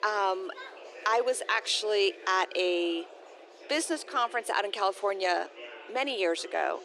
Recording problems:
thin; very; fading below 350 Hz
murmuring crowd; noticeable; throughout; 20 dB below the speech

